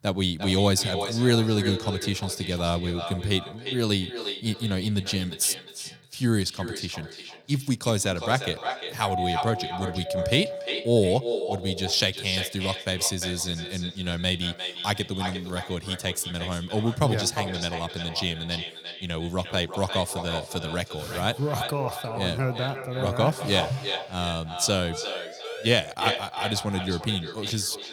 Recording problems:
echo of what is said; strong; throughout; 350 ms later, 7 dB below the speech
doorbell; noticeable; from 9 to 11 s; peak 2 dB below the speech
siren; faint; from 25 to 26 s; peak 10 dB below the speech

